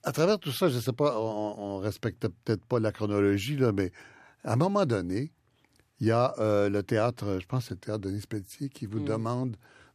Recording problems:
none

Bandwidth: 14.5 kHz